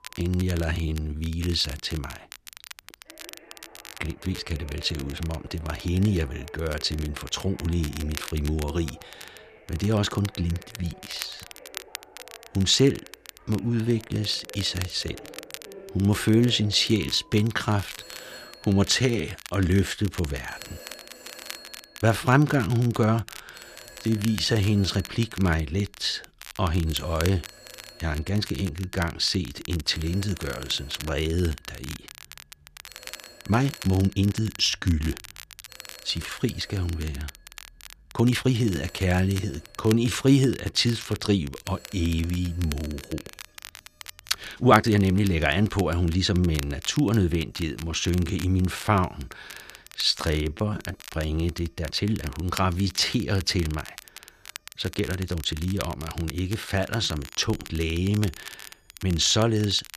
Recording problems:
crackle, like an old record; noticeable; 15 dB below the speech
alarms or sirens; faint; throughout; 25 dB below the speech
uneven, jittery; strongly; from 0.5 to 59 s

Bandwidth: 14.5 kHz